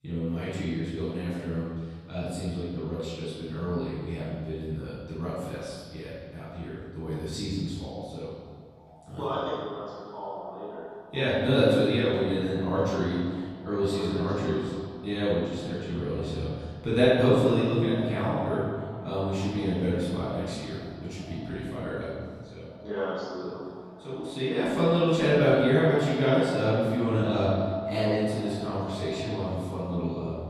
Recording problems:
room echo; strong; dies away in 1.6 s
off-mic speech; far
echo of what is said; noticeable; from 7.5 s on; 460 ms later, 15 dB below the speech

